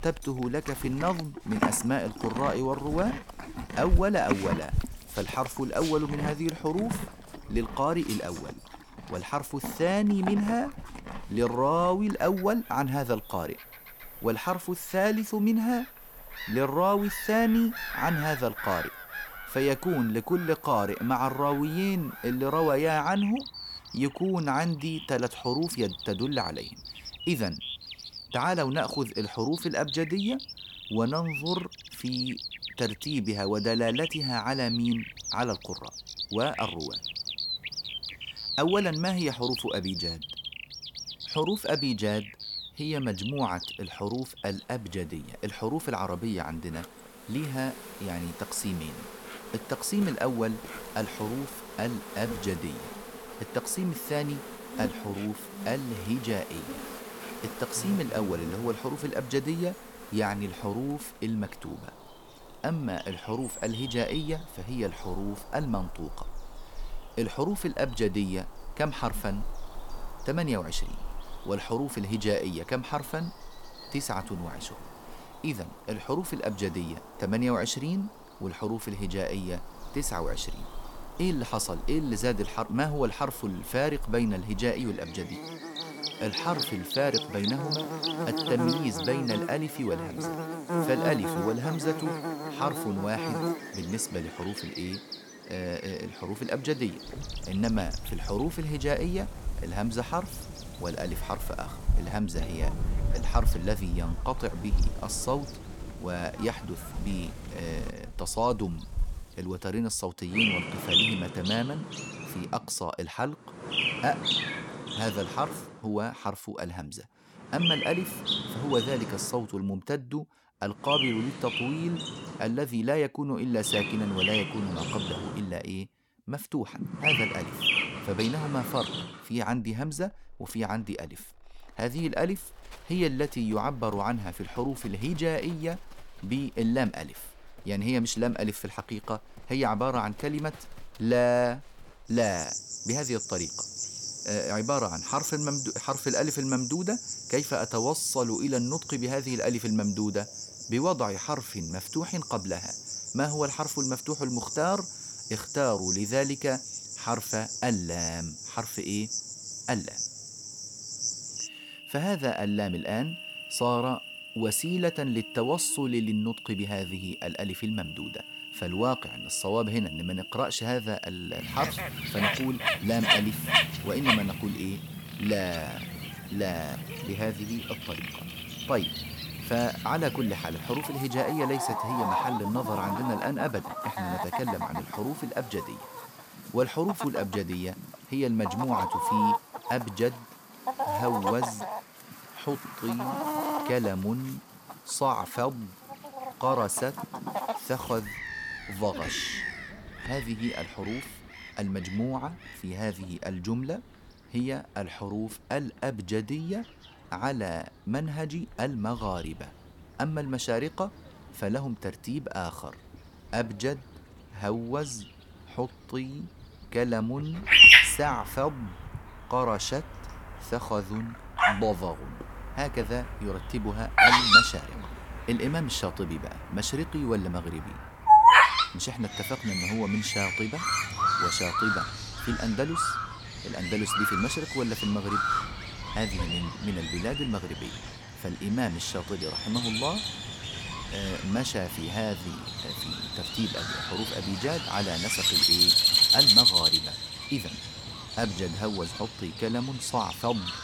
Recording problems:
animal sounds; very loud; throughout; 2 dB above the speech

